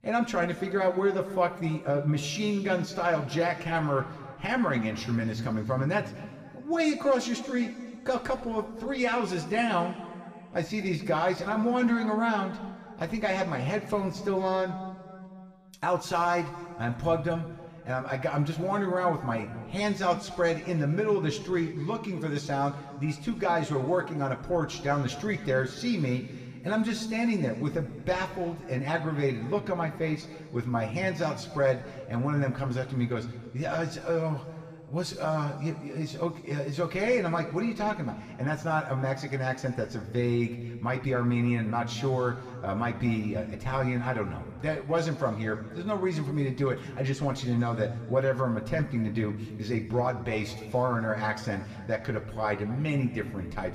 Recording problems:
room echo; slight; dies away in 1.9 s
off-mic speech; somewhat distant

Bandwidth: 15 kHz